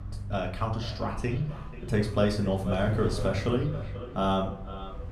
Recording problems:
echo of what is said; noticeable; throughout; 490 ms later, 15 dB below the speech
room echo; slight; dies away in 0.5 s
off-mic speech; somewhat distant
wind noise on the microphone; occasional gusts; 20 dB below the speech
low rumble; faint; throughout; 25 dB below the speech

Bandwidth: 14.5 kHz